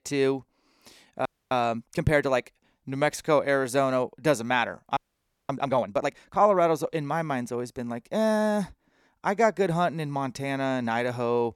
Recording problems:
audio freezing; at 1.5 s and at 5 s for 0.5 s

